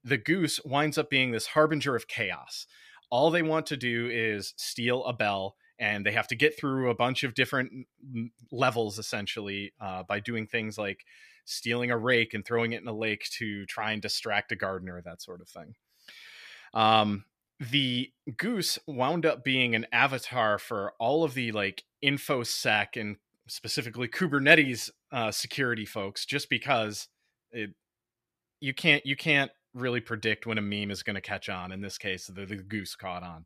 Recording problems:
none

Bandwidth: 14.5 kHz